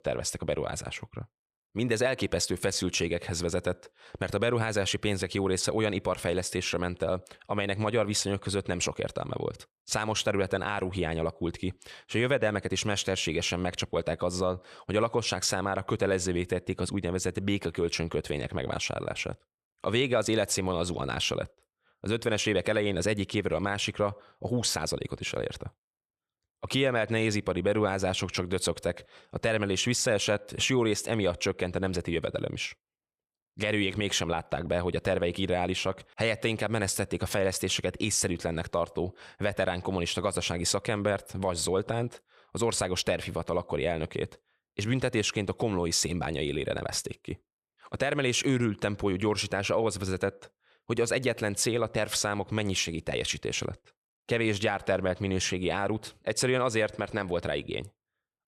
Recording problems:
none

